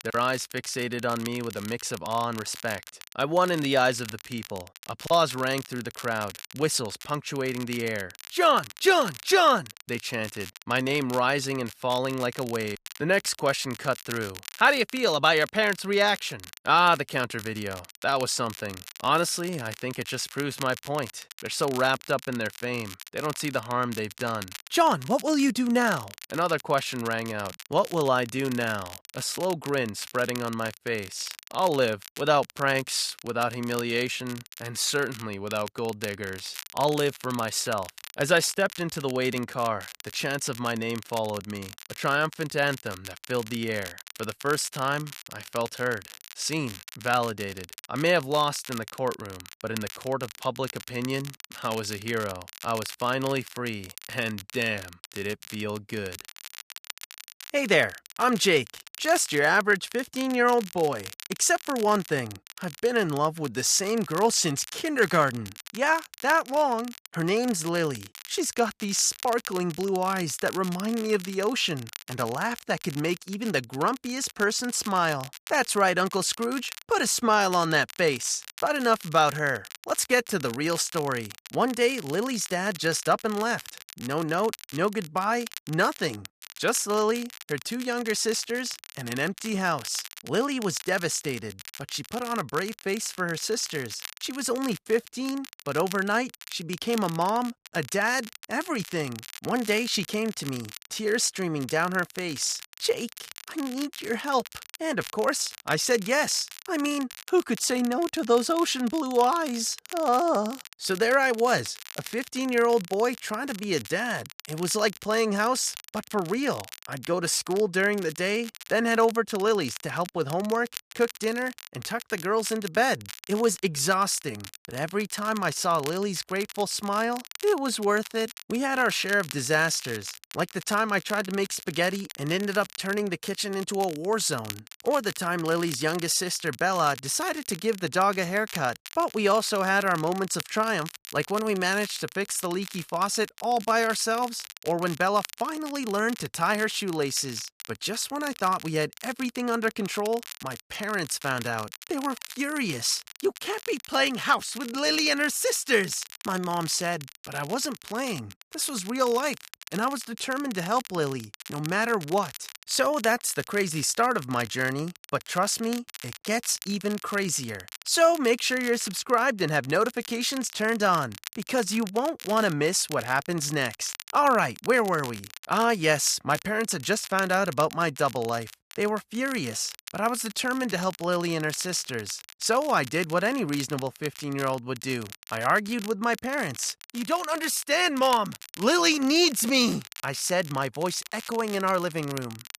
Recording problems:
crackle, like an old record; noticeable; 15 dB below the speech

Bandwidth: 14.5 kHz